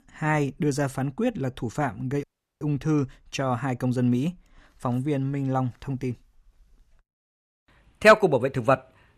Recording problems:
audio cutting out; at 2 s

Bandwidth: 14.5 kHz